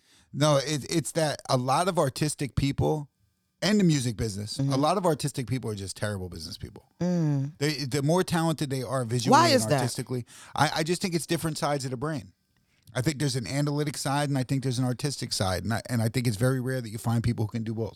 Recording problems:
none

